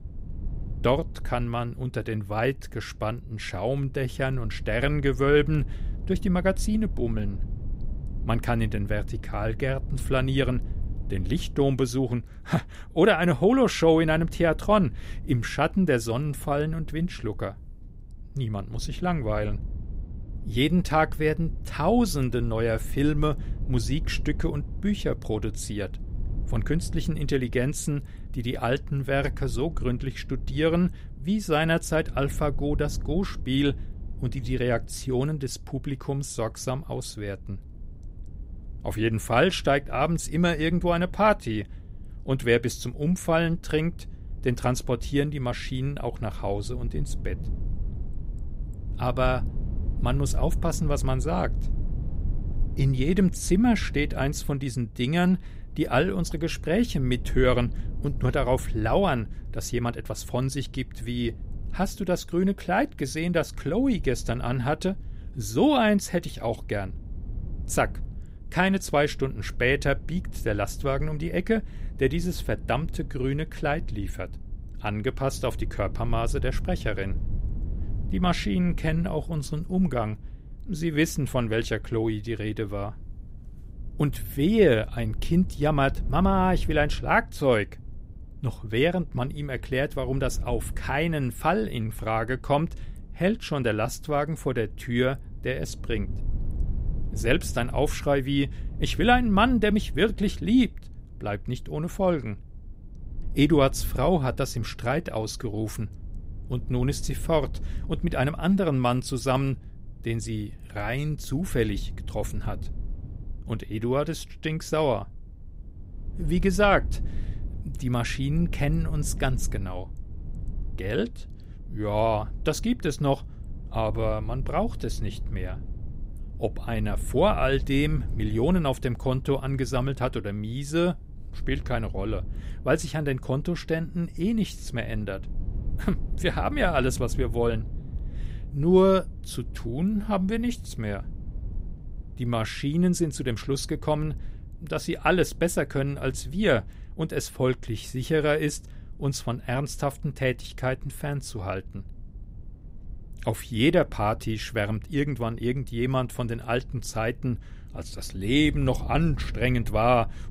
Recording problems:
low rumble; faint; throughout; 25 dB below the speech

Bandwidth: 15.5 kHz